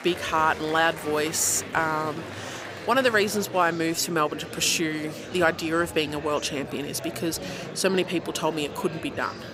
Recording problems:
murmuring crowd; noticeable; throughout; 10 dB below the speech

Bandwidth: 15.5 kHz